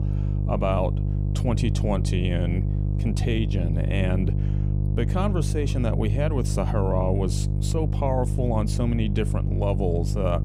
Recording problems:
electrical hum; loud; throughout; 50 Hz, 8 dB below the speech

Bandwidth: 15 kHz